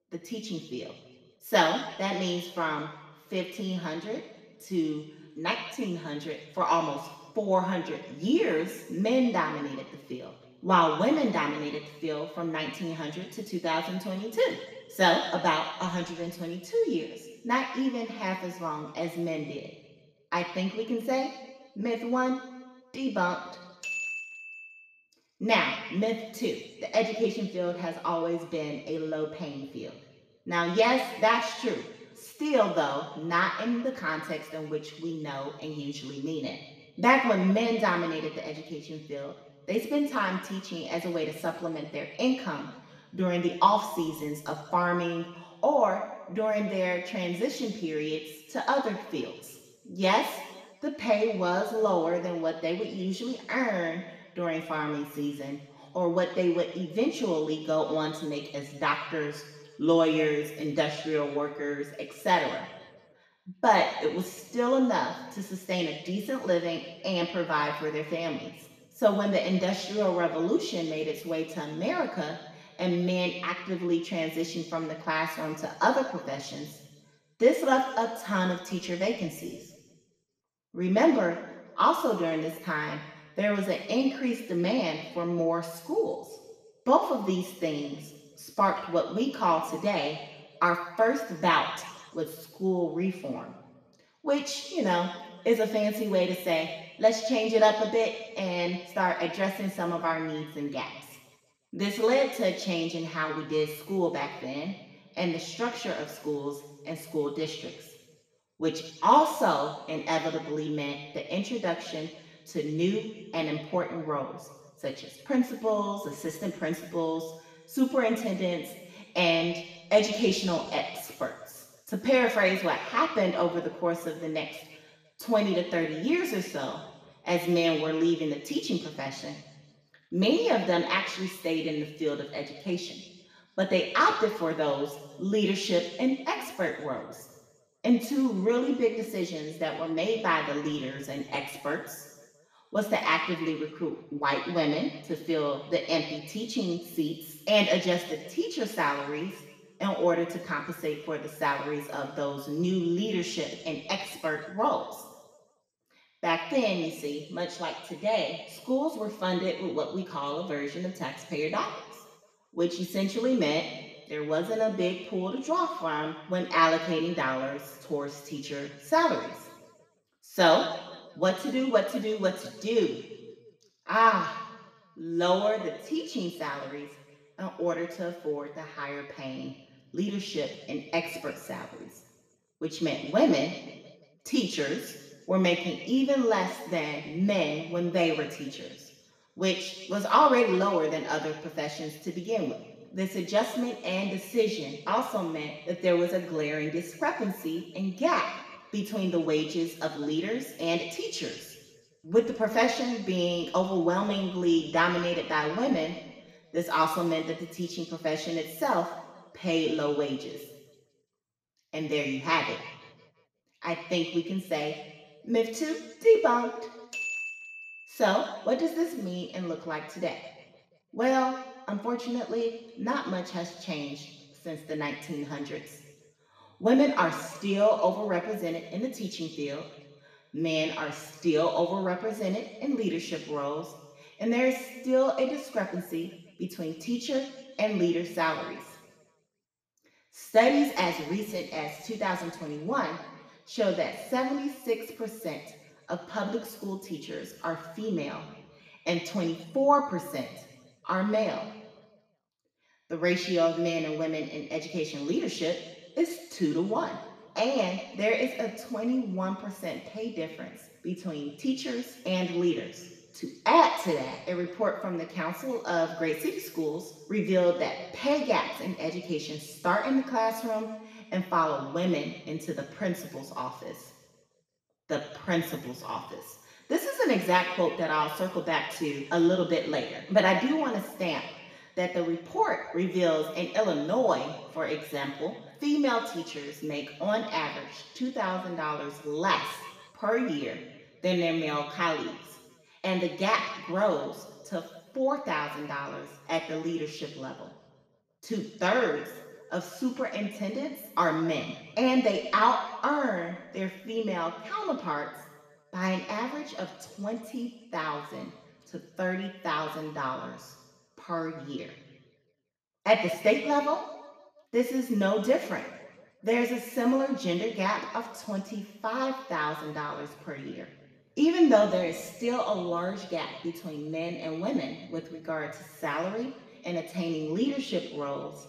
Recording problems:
off-mic speech; far
room echo; noticeable; dies away in 1.2 s

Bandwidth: 14.5 kHz